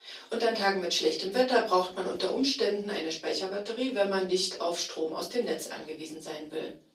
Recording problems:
off-mic speech; far
thin; somewhat; fading below 300 Hz
room echo; slight; dies away in 0.3 s
garbled, watery; slightly; nothing above 15.5 kHz

